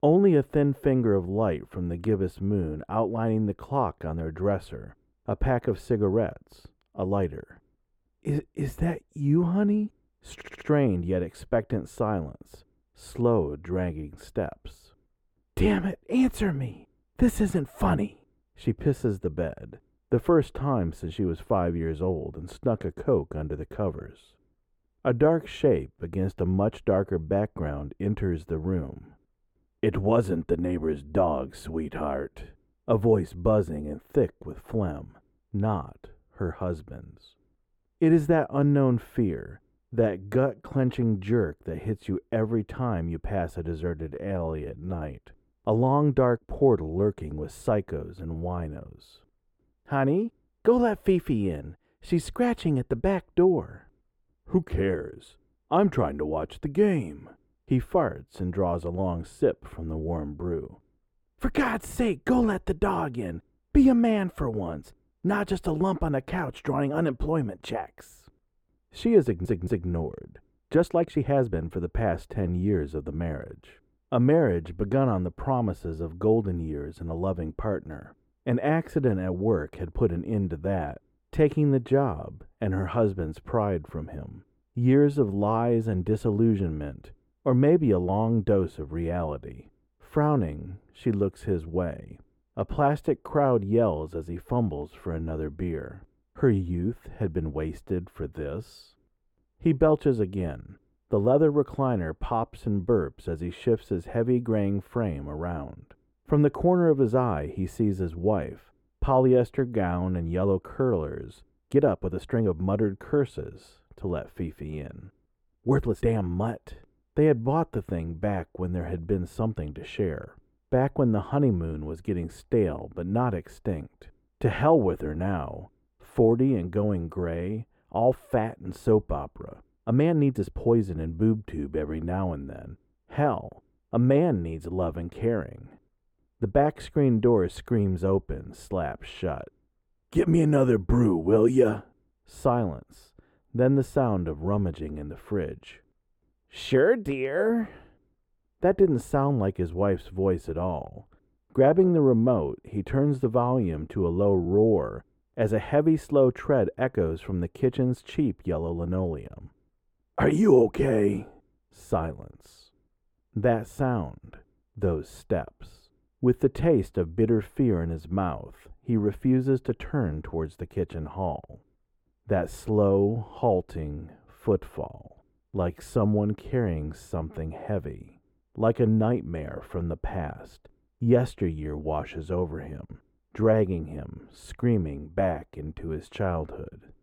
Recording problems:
muffled; very; fading above 3 kHz
uneven, jittery; strongly; from 7 s to 3:06
audio stuttering; at 10 s and at 1:09

